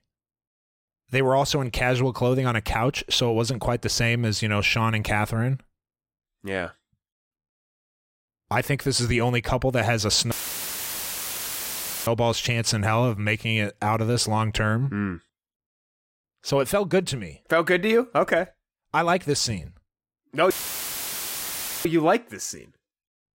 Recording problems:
audio cutting out; filled with static; at 10 s for 2 s and at 21 s for 1.5 s

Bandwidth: 16 kHz